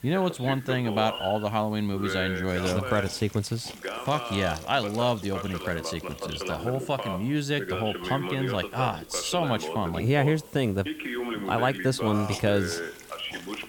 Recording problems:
voice in the background; loud; throughout; 7 dB below the speech
hiss; noticeable; throughout; 20 dB below the speech

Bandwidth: 17.5 kHz